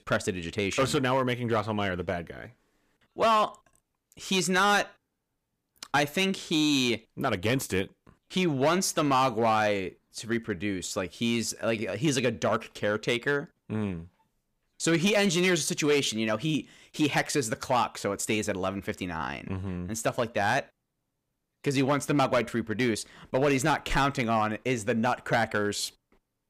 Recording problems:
distortion; slight; 4% of the sound clipped

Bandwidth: 15 kHz